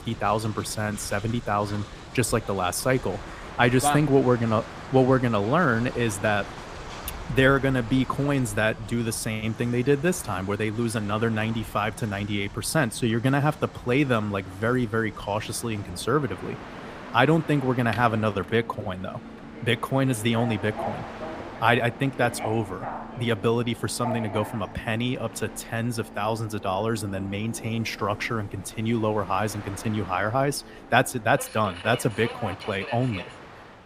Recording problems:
train or aircraft noise; noticeable; throughout; 15 dB below the speech

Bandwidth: 15 kHz